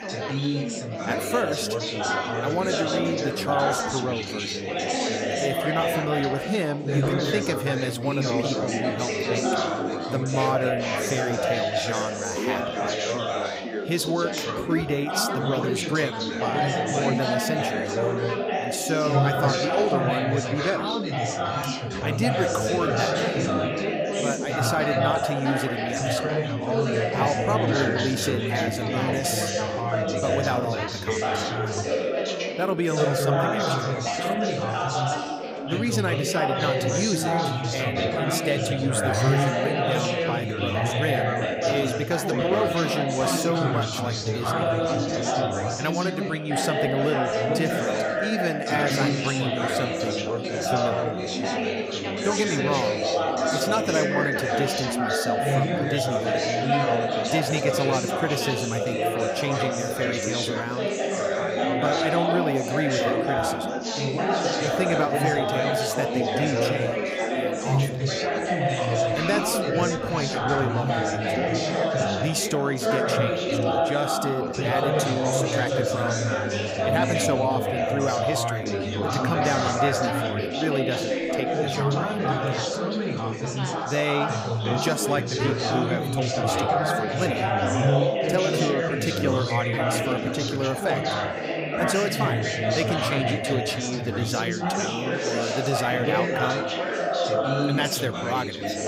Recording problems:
chatter from many people; very loud; throughout; 3 dB above the speech

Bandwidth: 15.5 kHz